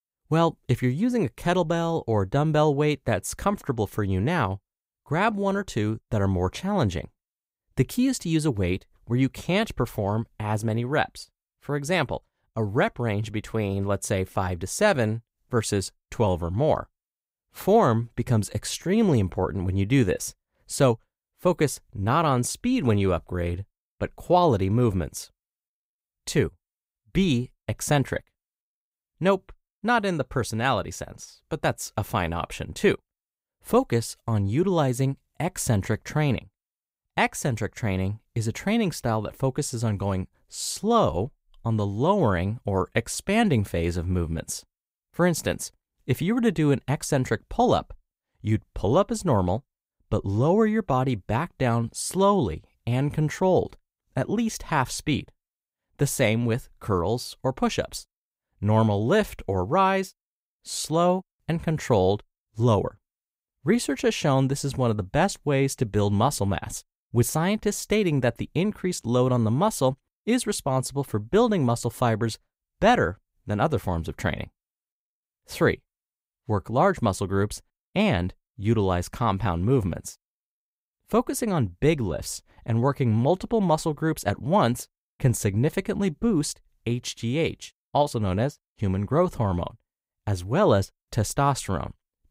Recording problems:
none

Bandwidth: 15.5 kHz